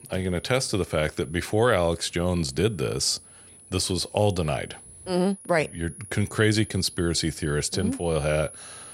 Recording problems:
high-pitched whine; noticeable; throughout; 10.5 kHz, 20 dB below the speech

